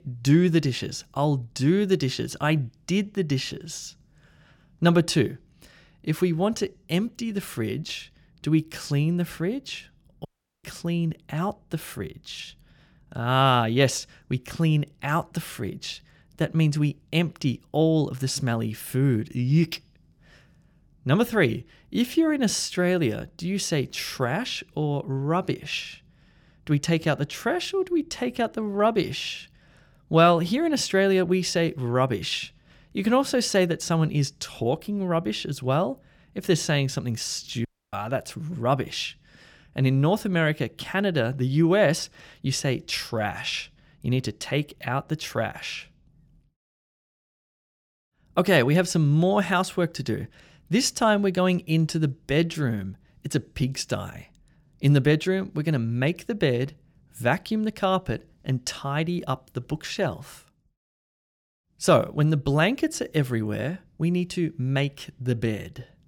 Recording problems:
audio cutting out; at 10 s and at 38 s

